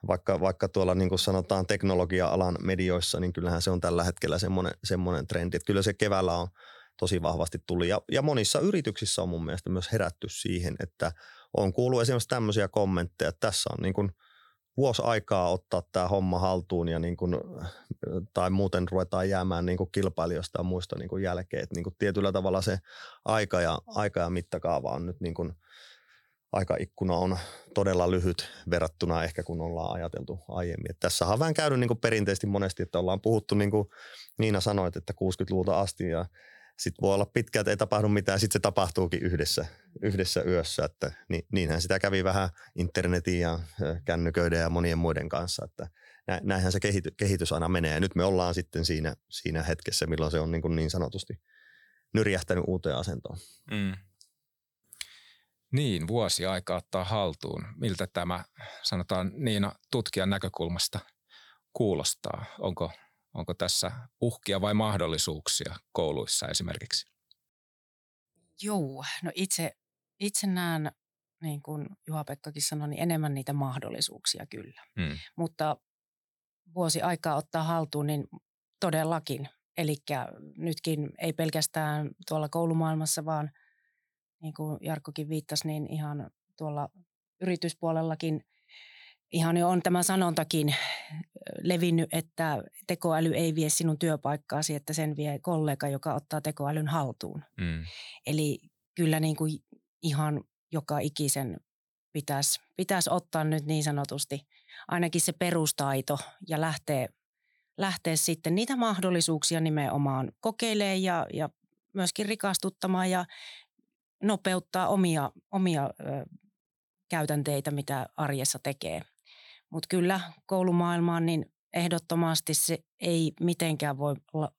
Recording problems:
none

